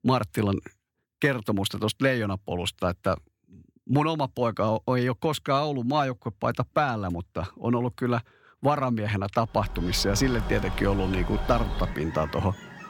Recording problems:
animal sounds; loud; from 10 s on; 8 dB below the speech

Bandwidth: 17 kHz